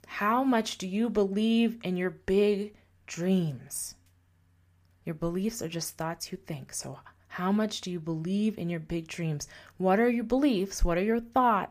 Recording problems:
none

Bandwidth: 15 kHz